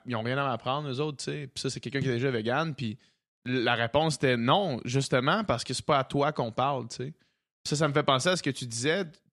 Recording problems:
none

